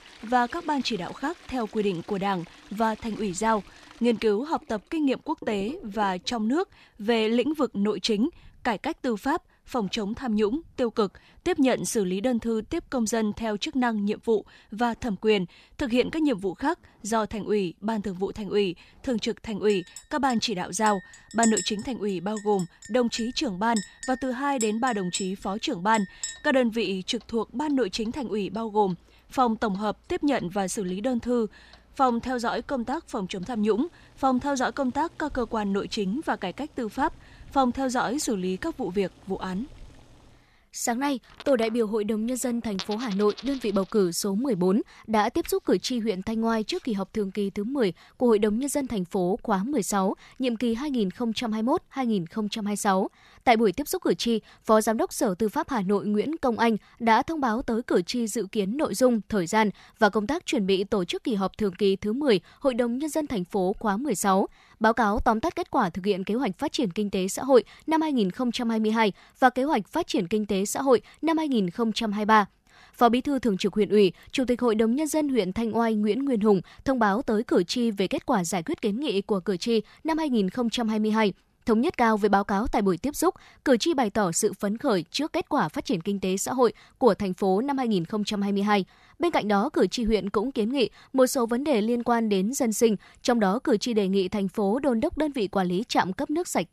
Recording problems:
household noises; noticeable; until 44 s; 15 dB below the speech

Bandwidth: 14 kHz